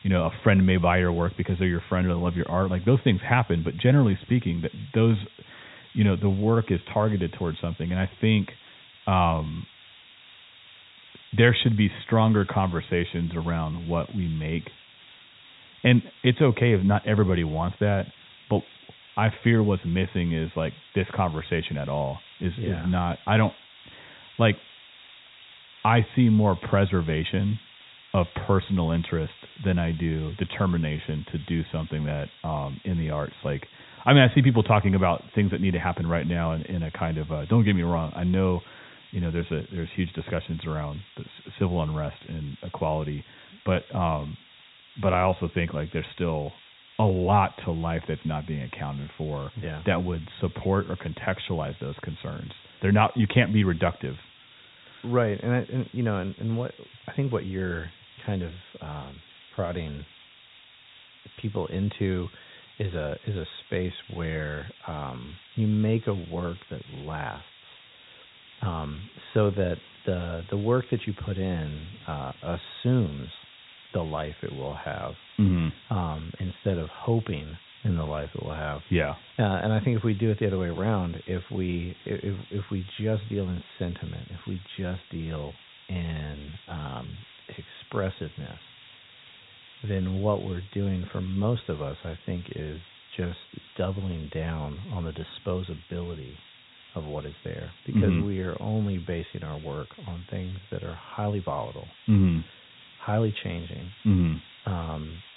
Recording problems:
high frequencies cut off; severe; nothing above 4 kHz
hiss; faint; throughout; 20 dB below the speech

